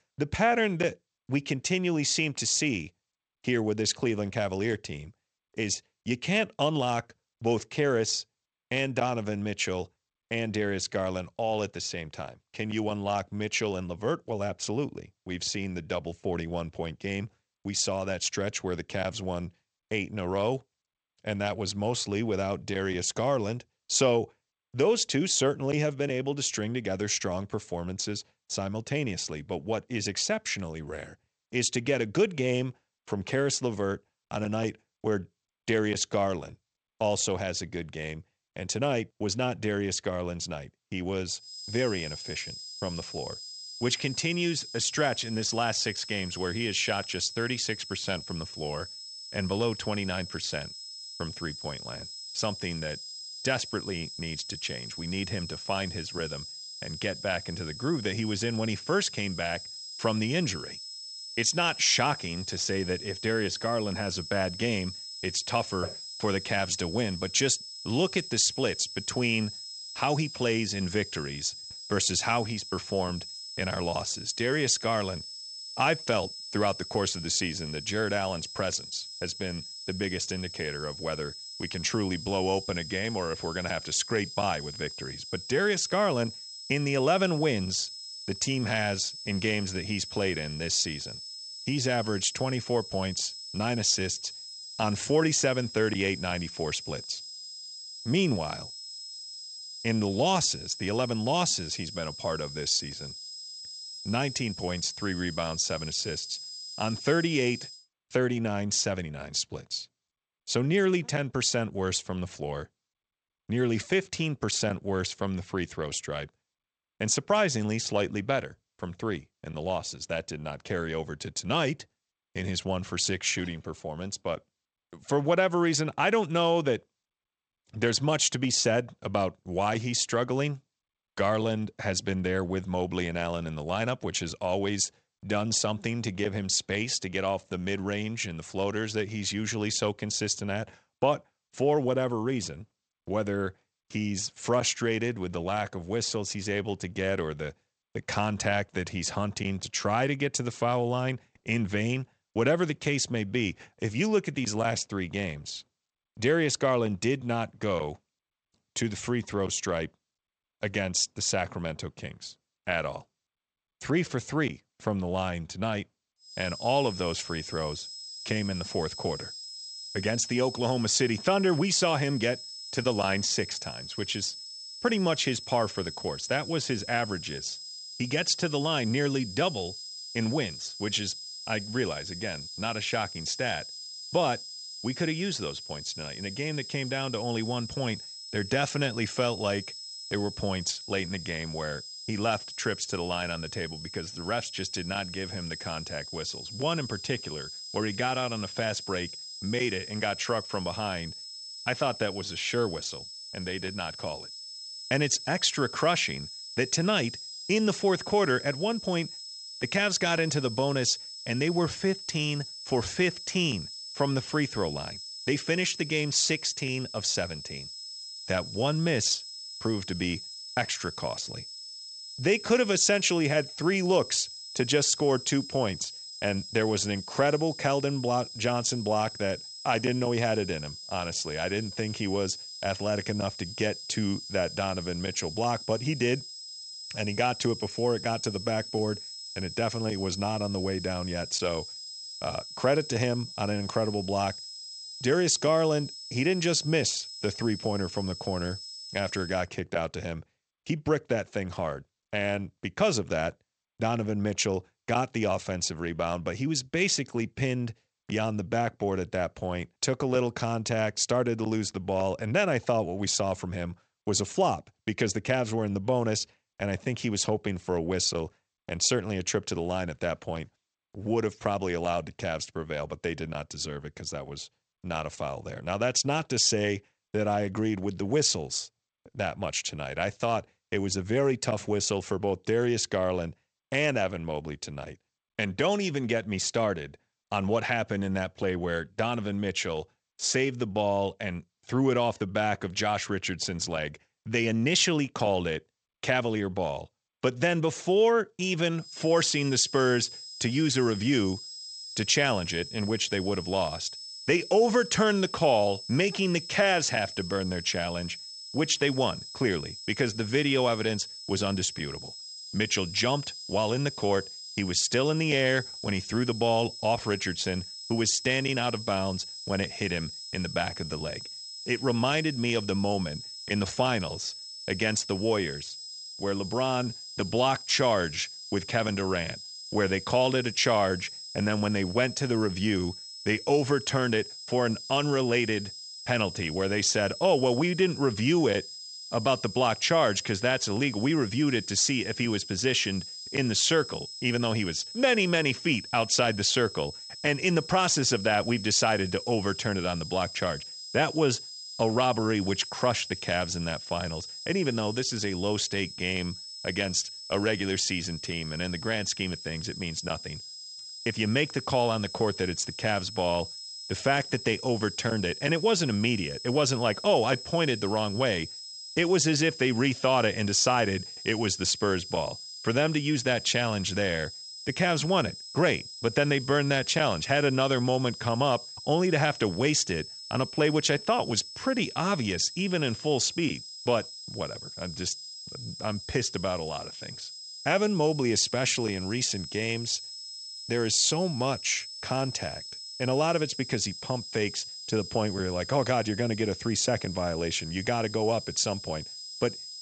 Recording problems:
garbled, watery; slightly; nothing above 8 kHz
high-pitched whine; noticeable; from 41 s to 1:48, from 2:46 to 4:09 and from 4:59 on; 5 kHz, 10 dB below the speech

